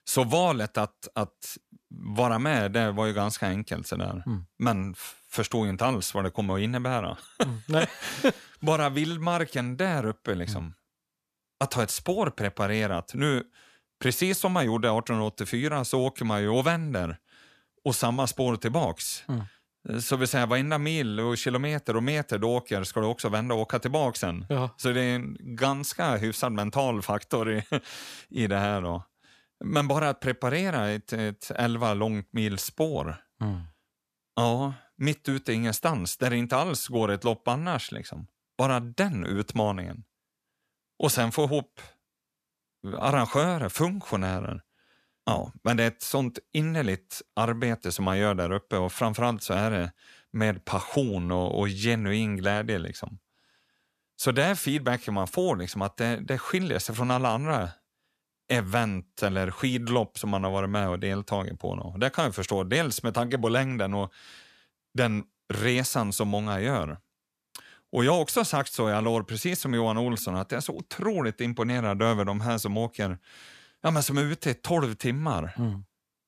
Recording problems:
none

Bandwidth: 14.5 kHz